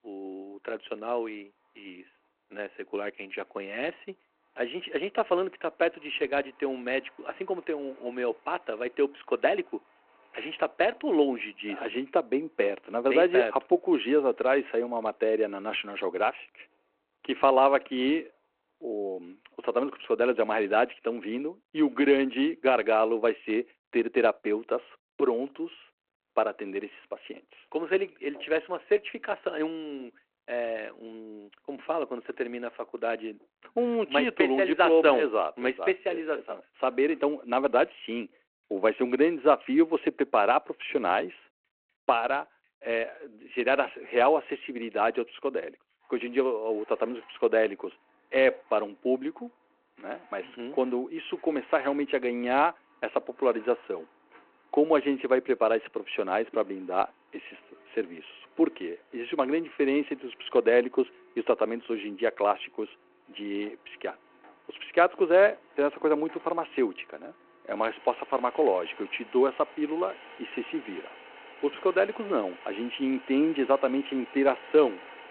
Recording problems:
phone-call audio
traffic noise; faint; throughout; 25 dB below the speech

